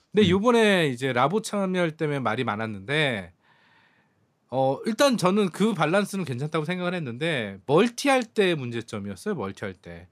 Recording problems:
none

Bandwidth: 15 kHz